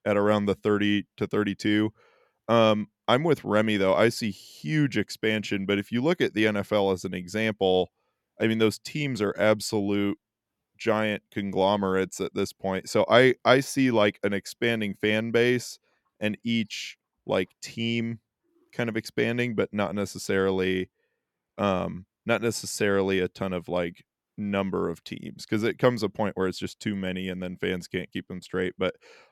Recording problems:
none

